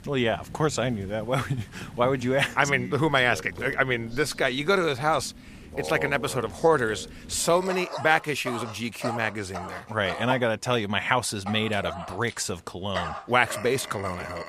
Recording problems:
animal sounds; noticeable; throughout; 15 dB below the speech

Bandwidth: 15 kHz